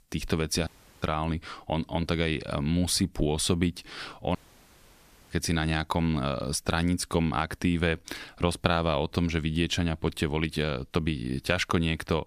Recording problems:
audio cutting out; at 0.5 s and at 4.5 s for 1 s

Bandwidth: 14.5 kHz